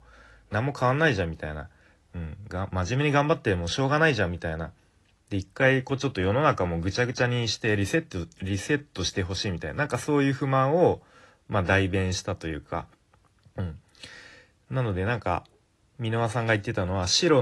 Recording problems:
garbled, watery; slightly; nothing above 11.5 kHz
abrupt cut into speech; at the end

